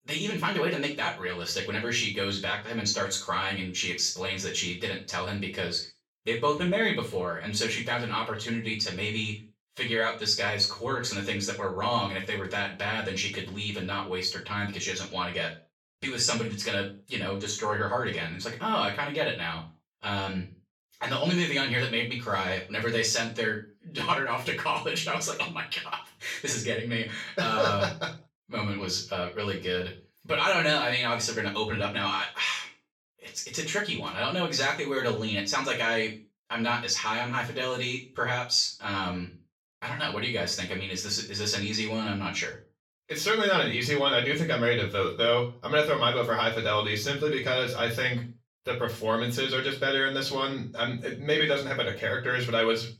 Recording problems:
off-mic speech; far
room echo; slight; dies away in 0.3 s

